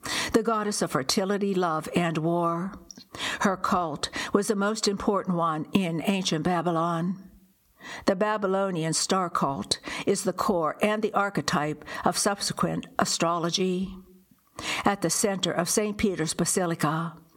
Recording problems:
squashed, flat; heavily

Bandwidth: 17.5 kHz